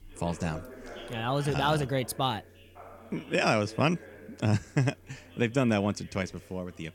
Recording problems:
background chatter; noticeable; throughout; 3 voices, 20 dB below the speech

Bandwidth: 17.5 kHz